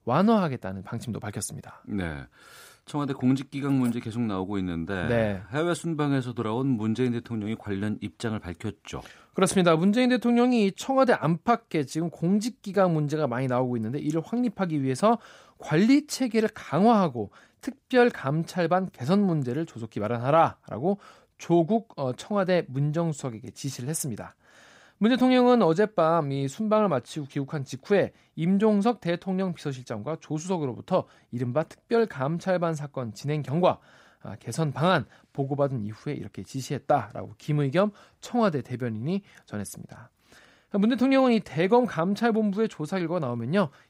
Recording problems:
none

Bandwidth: 15.5 kHz